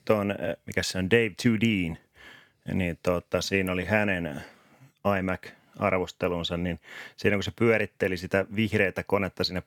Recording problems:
none

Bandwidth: 18.5 kHz